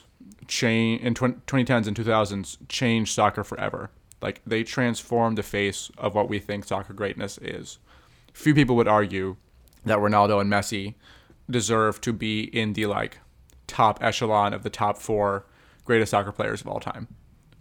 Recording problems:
none

